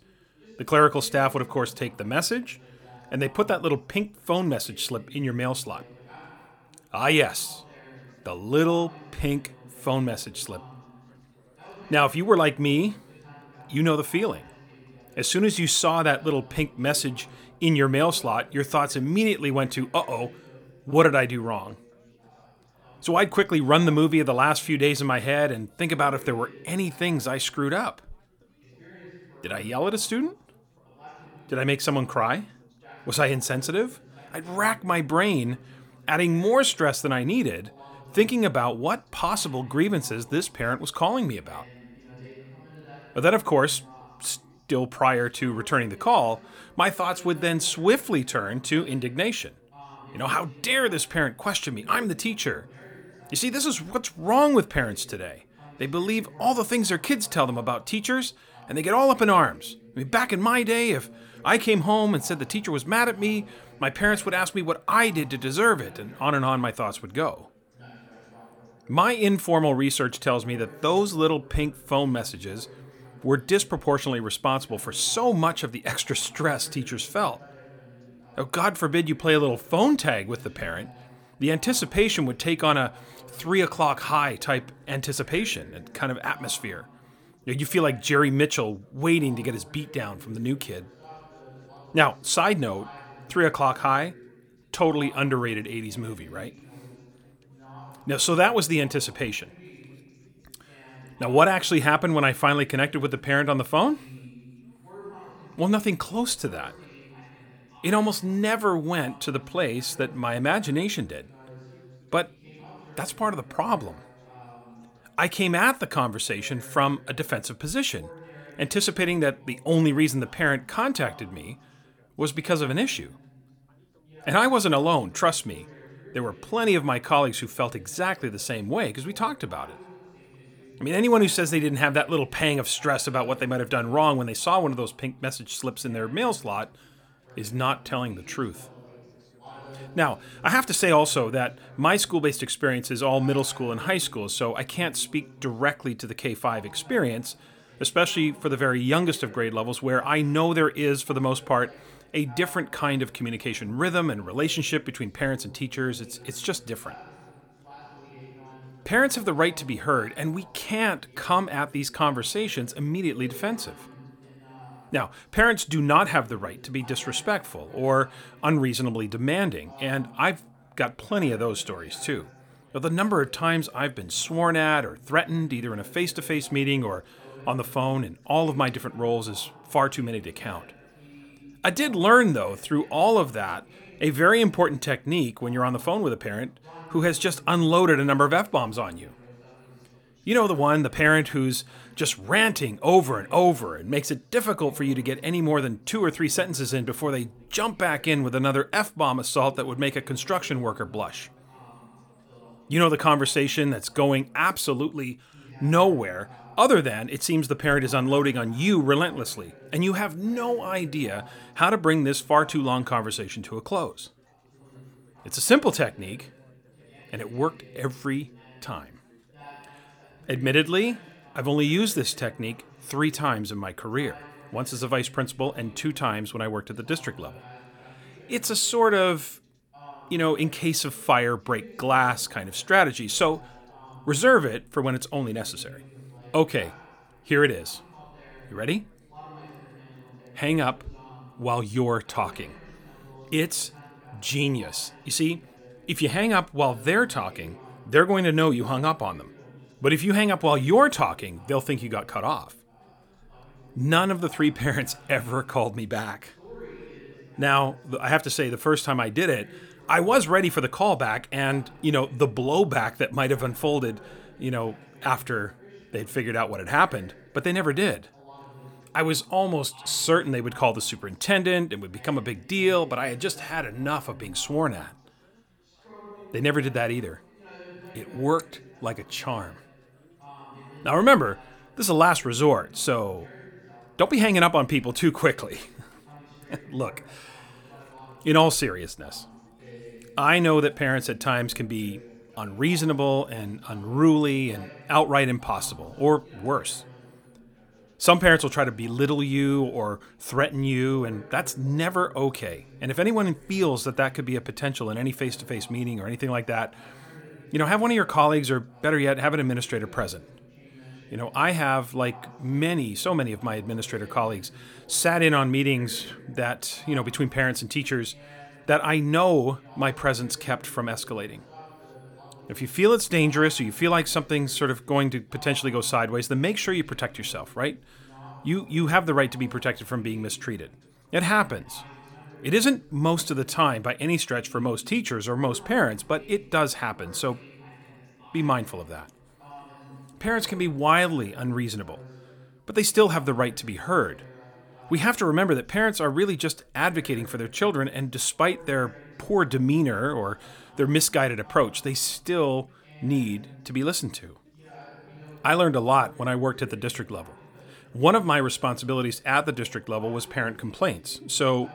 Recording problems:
background chatter; faint; throughout; 3 voices, 25 dB below the speech

